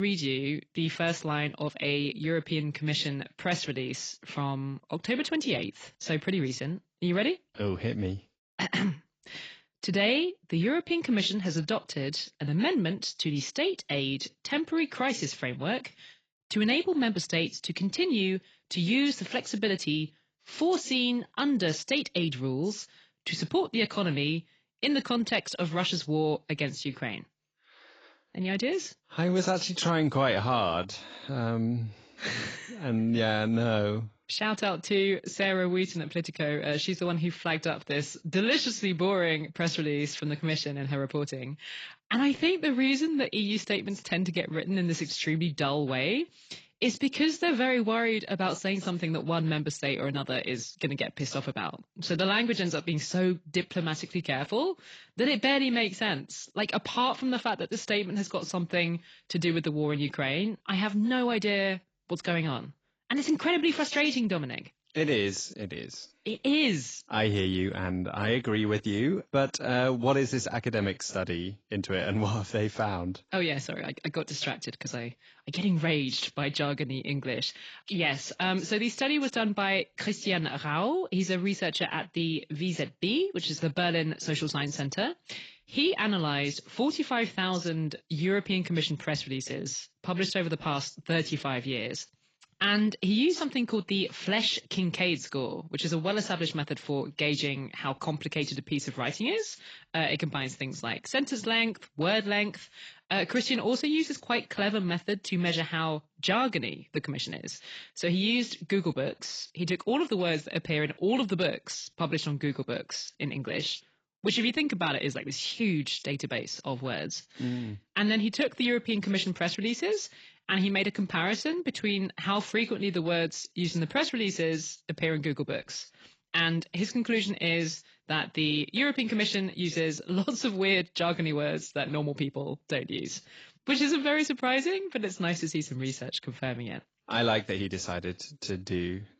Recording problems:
garbled, watery; badly; nothing above 7.5 kHz
abrupt cut into speech; at the start

